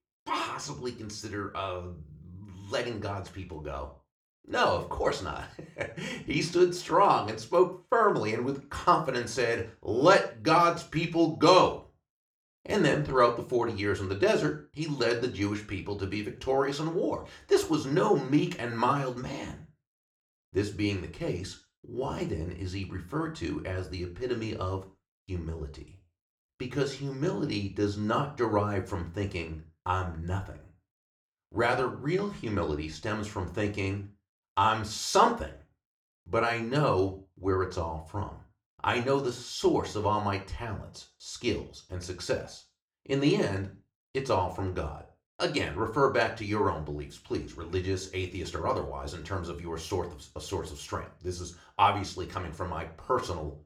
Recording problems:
room echo; very slight; dies away in 0.3 s
off-mic speech; somewhat distant

